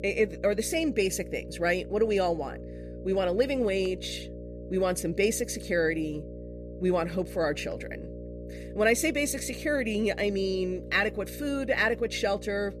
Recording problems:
electrical hum; noticeable; throughout; 60 Hz, 15 dB below the speech

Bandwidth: 14.5 kHz